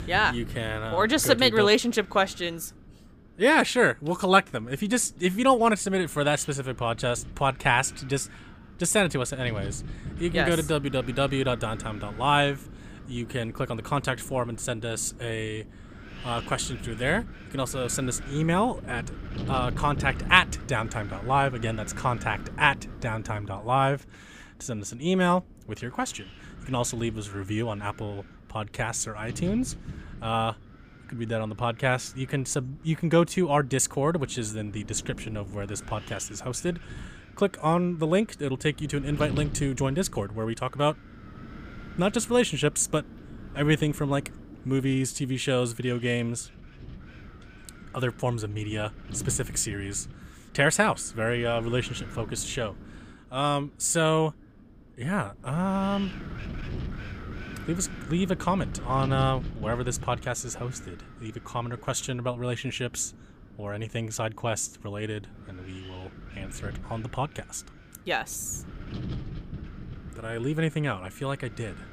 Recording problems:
wind noise on the microphone; occasional gusts; 20 dB below the speech

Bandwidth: 15 kHz